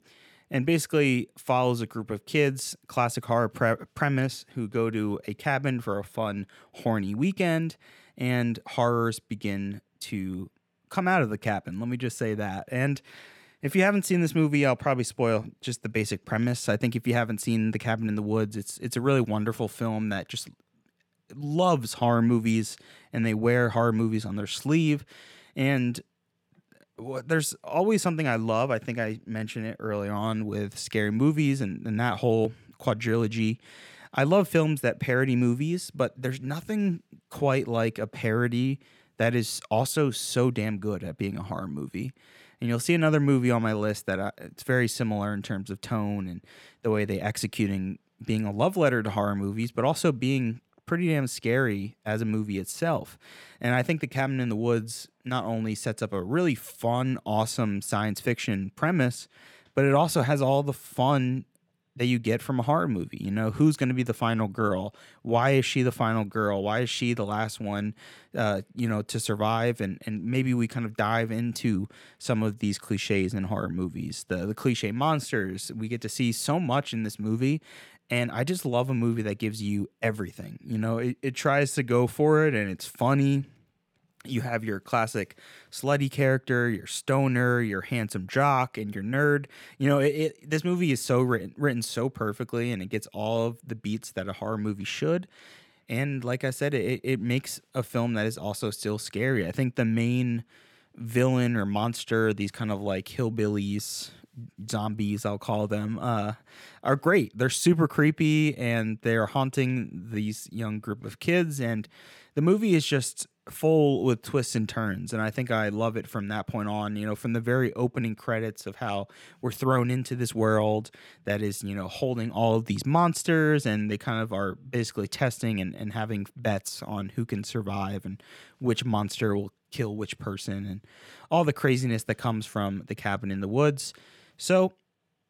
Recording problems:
none

